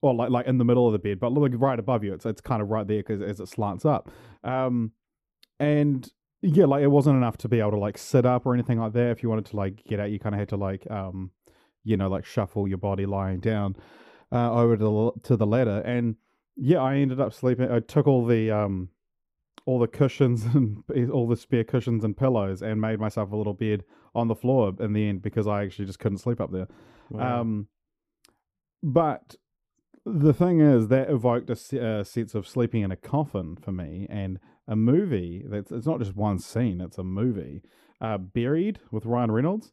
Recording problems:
muffled; very; fading above 1 kHz

